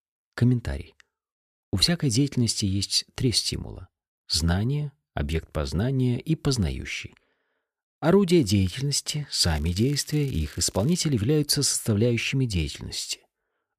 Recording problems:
crackling; faint; from 9.5 to 11 s; 25 dB below the speech

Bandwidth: 14.5 kHz